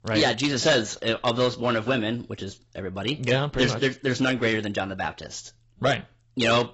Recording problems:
garbled, watery; badly; nothing above 7.5 kHz
distortion; slight; 3% of the sound clipped

